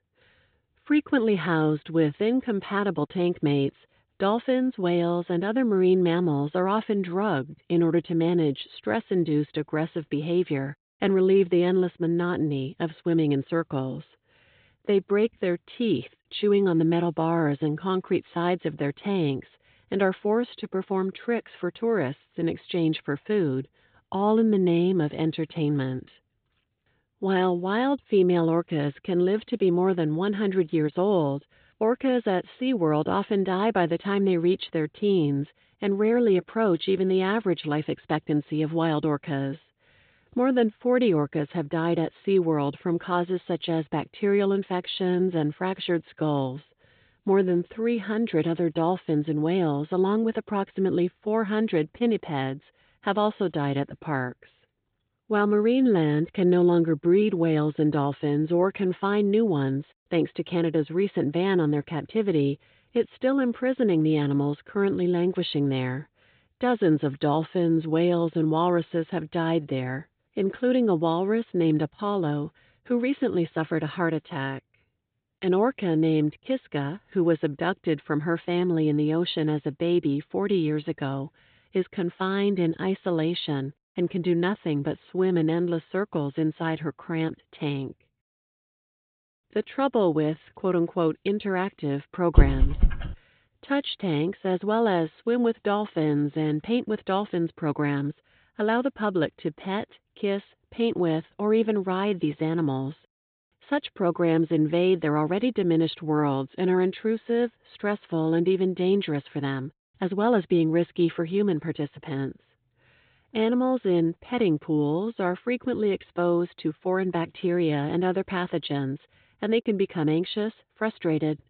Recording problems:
high frequencies cut off; severe; nothing above 4 kHz
dog barking; loud; at 1:32; peak 4 dB above the speech

